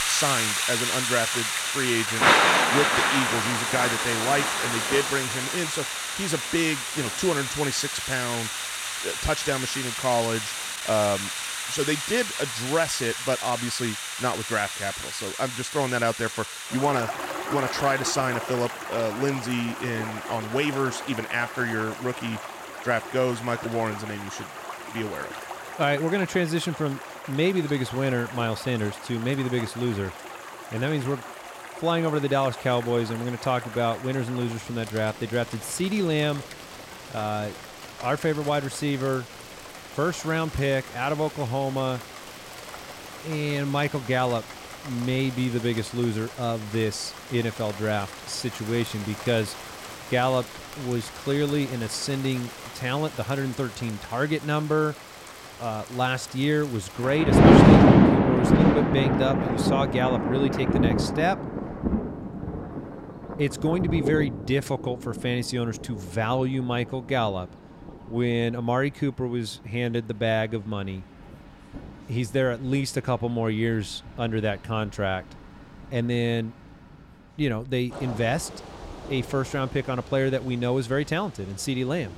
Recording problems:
rain or running water; very loud; throughout; 1 dB above the speech

